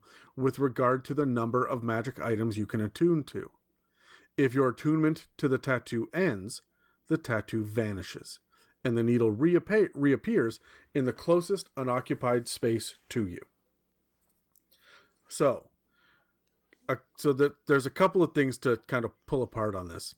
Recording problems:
garbled, watery; slightly; nothing above 18 kHz

